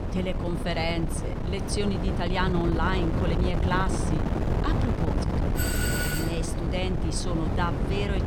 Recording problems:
wind noise on the microphone; heavy; 3 dB below the speech
footsteps; faint; at 4.5 s; peak 15 dB below the speech
doorbell; loud; at 5.5 s; peak 2 dB above the speech

